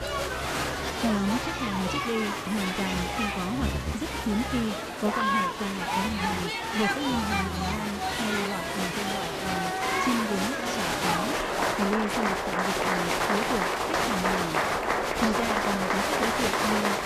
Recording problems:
crowd noise; very loud; throughout; 4 dB above the speech
animal sounds; loud; throughout; 9 dB below the speech

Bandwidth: 14.5 kHz